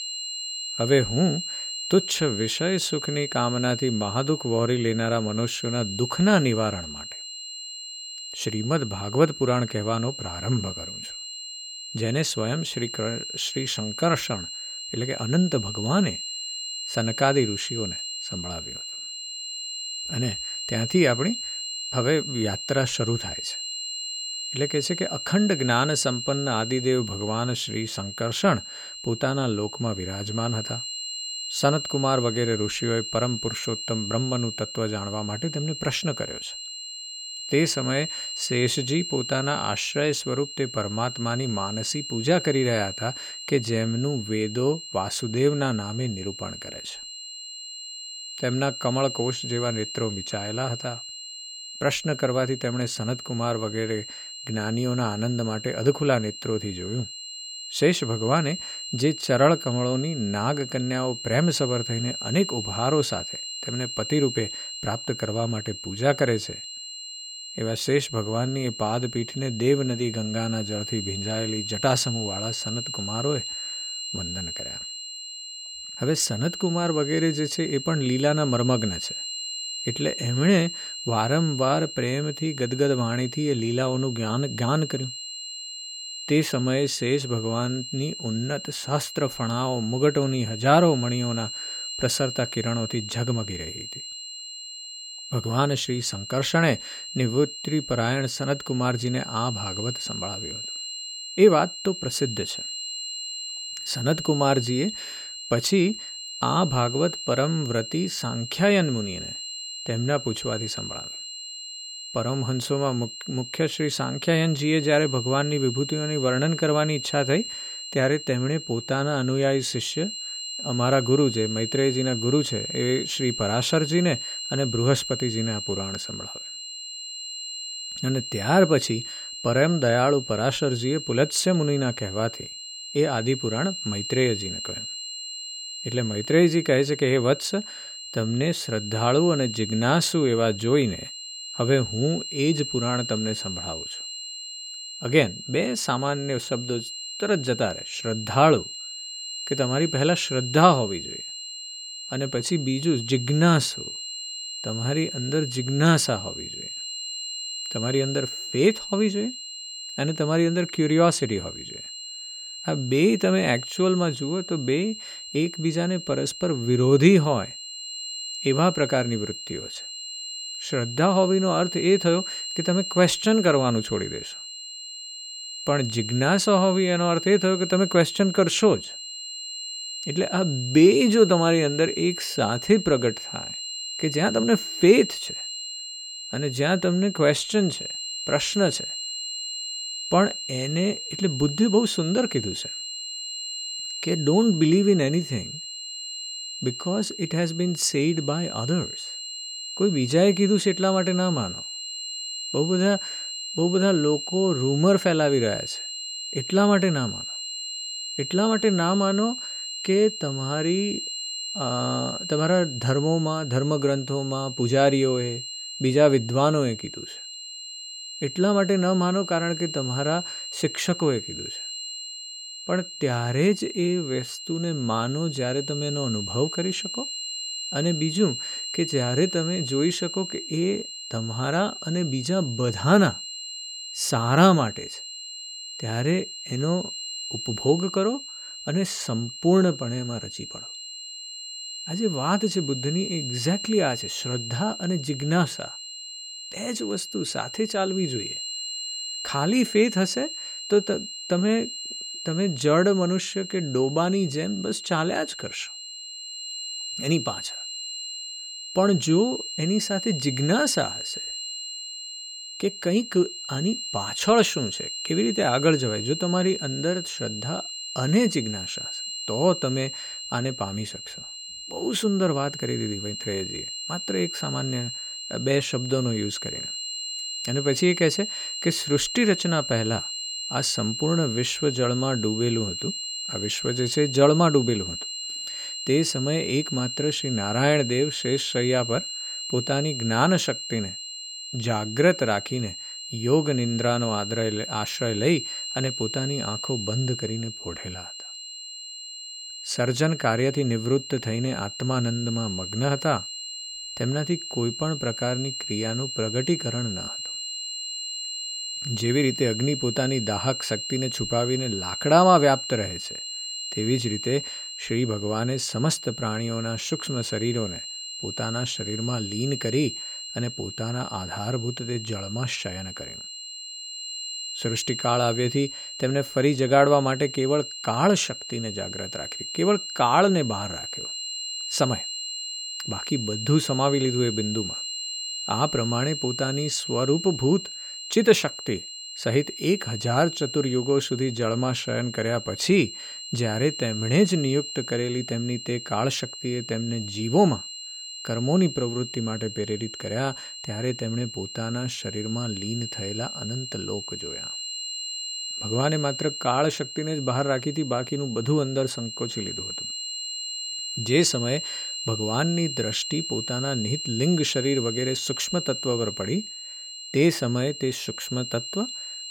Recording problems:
high-pitched whine; loud; throughout; 4 kHz, 7 dB below the speech

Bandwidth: 17.5 kHz